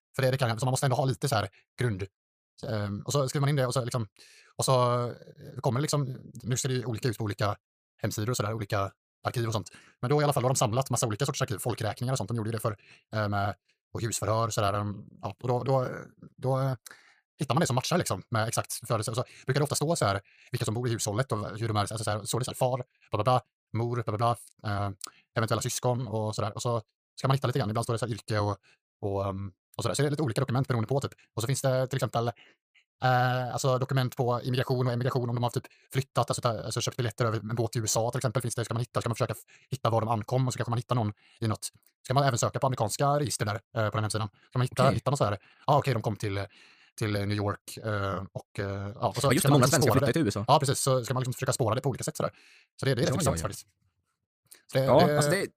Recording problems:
wrong speed, natural pitch; too fast; 1.7 times normal speed

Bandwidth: 15 kHz